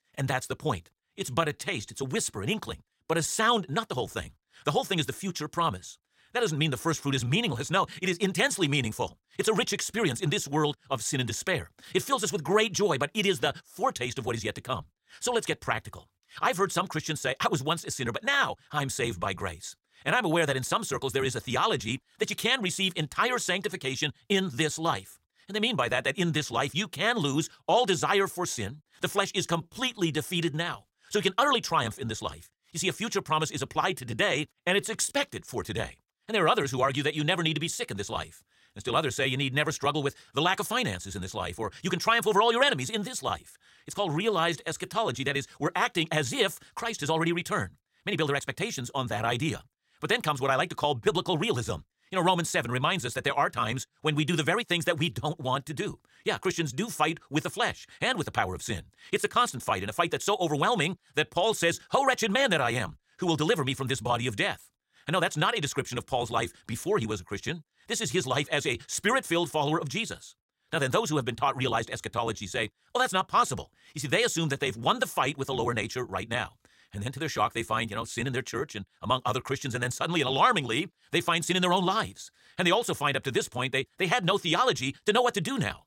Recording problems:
wrong speed, natural pitch; too fast; 1.5 times normal speed
uneven, jittery; strongly; from 1 s to 1:13

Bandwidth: 16 kHz